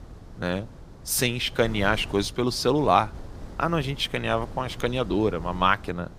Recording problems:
wind noise on the microphone; occasional gusts; 20 dB below the speech

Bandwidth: 15 kHz